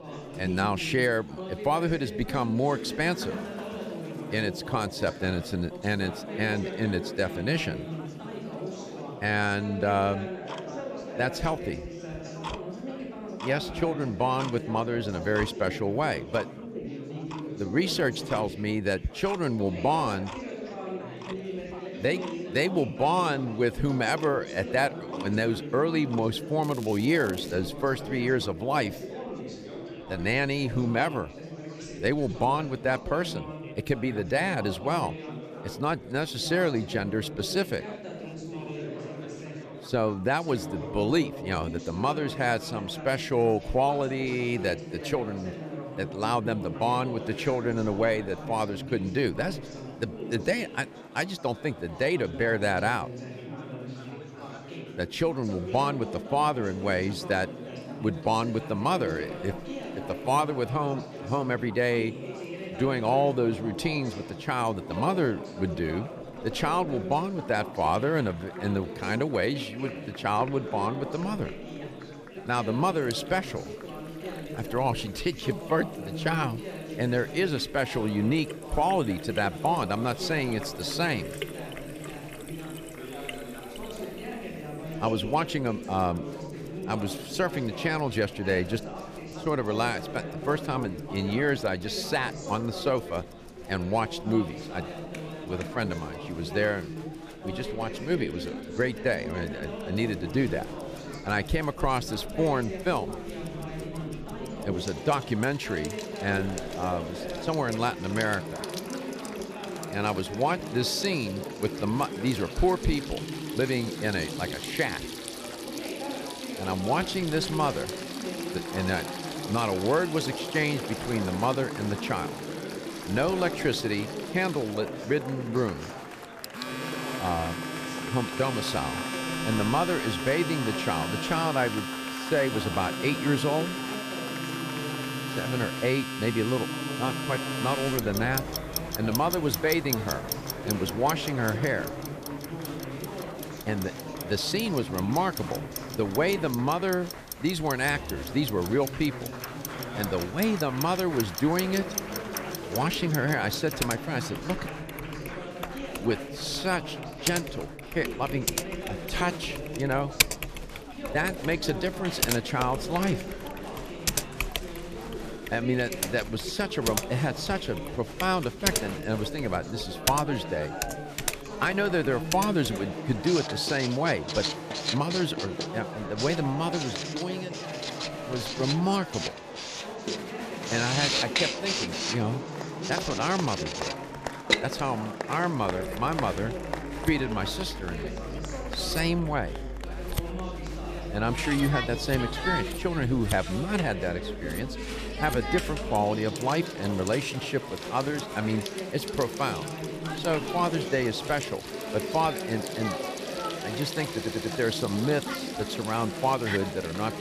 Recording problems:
household noises; loud; throughout; 7 dB below the speech
chatter from many people; loud; throughout; 8 dB below the speech
crackling; noticeable; at 27 s; 20 dB below the speech
audio stuttering; at 3:24

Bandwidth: 14.5 kHz